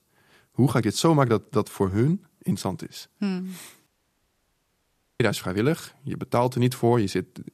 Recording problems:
audio cutting out; at 4 s for 1.5 s

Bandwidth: 14.5 kHz